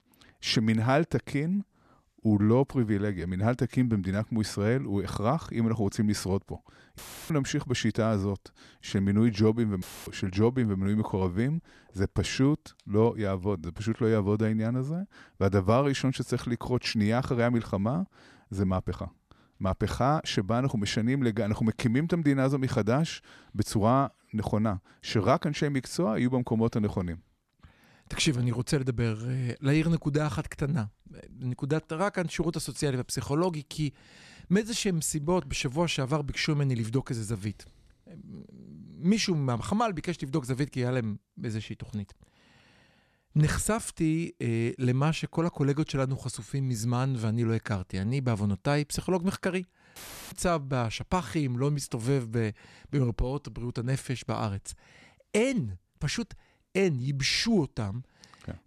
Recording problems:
audio cutting out; filled with static; at 7 s, at 10 s and at 50 s

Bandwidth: 13.5 kHz